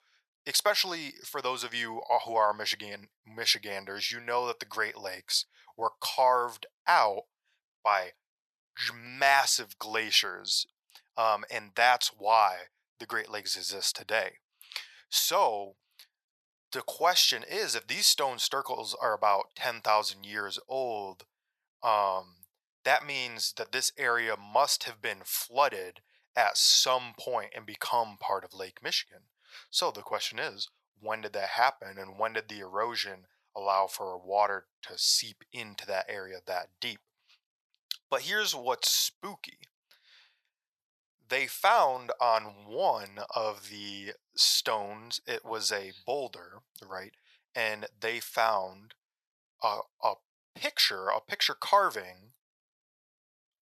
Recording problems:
thin; very; fading below 850 Hz

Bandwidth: 13.5 kHz